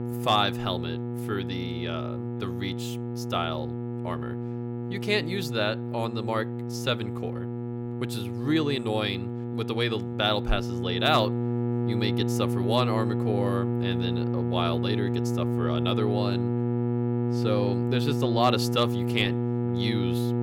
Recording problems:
electrical hum; loud; throughout; 60 Hz, 6 dB below the speech

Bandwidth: 16.5 kHz